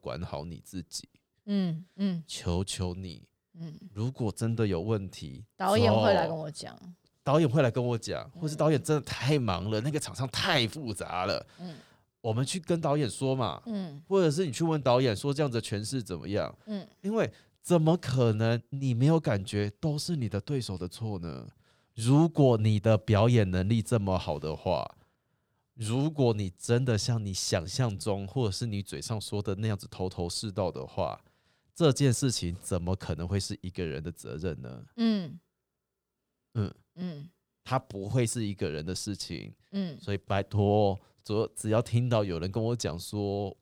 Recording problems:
none

